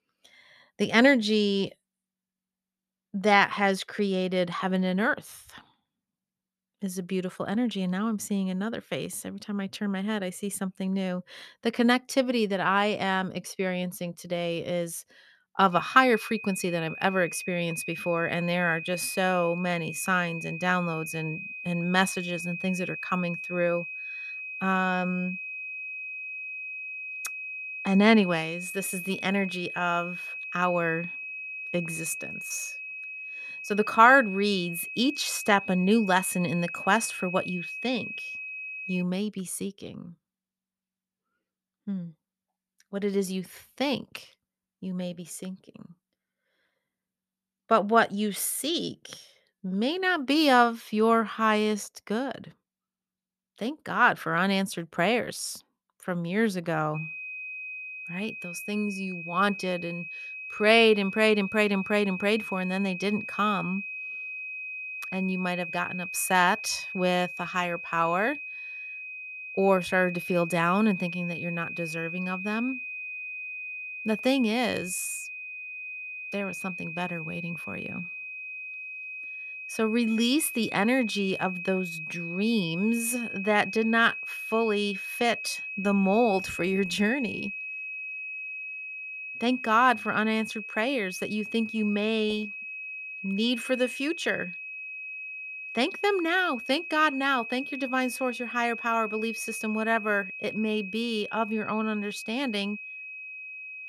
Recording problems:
high-pitched whine; loud; from 16 to 39 s and from 57 s on; 2.5 kHz, 8 dB below the speech

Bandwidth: 13.5 kHz